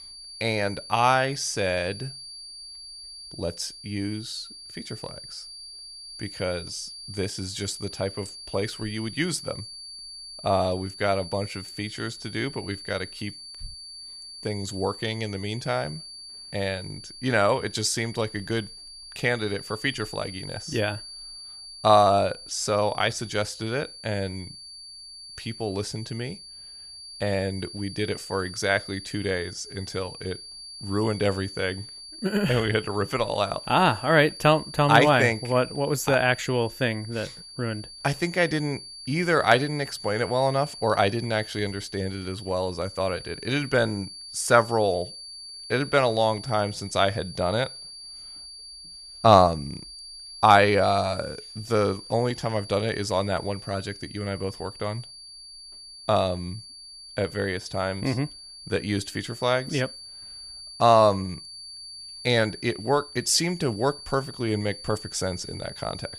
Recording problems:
high-pitched whine; noticeable; throughout; 4.5 kHz, 15 dB below the speech

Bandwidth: 14.5 kHz